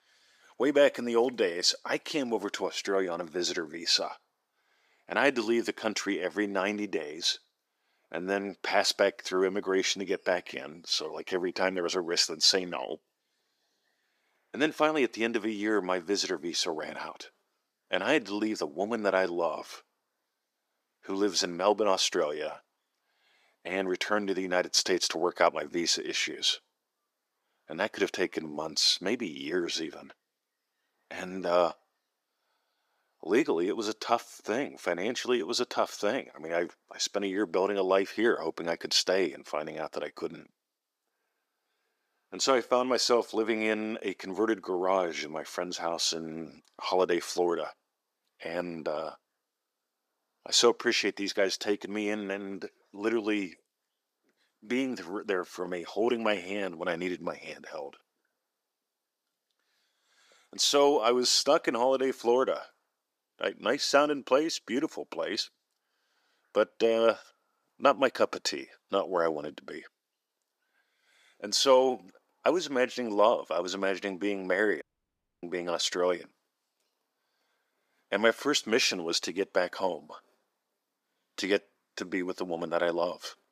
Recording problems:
thin; somewhat; fading below 350 Hz
audio cutting out; at 1:15 for 0.5 s

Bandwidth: 15 kHz